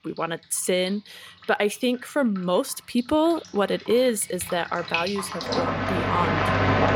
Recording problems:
rain or running water; loud; throughout; as loud as the speech

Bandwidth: 17 kHz